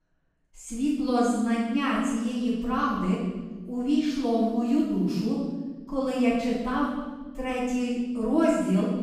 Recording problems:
room echo; strong; dies away in 1.3 s
off-mic speech; far

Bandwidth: 15.5 kHz